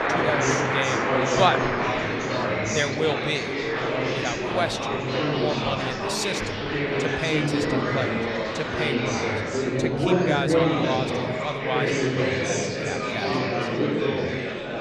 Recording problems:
murmuring crowd; very loud; throughout; 5 dB above the speech

